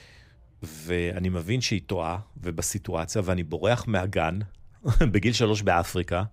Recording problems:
none

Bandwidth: 15.5 kHz